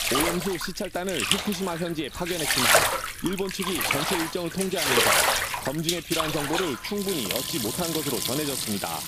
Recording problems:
household noises; very loud; throughout; 5 dB above the speech
background music; noticeable; from 6.5 s on; 20 dB below the speech
voice in the background; faint; throughout; 30 dB below the speech

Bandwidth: 15 kHz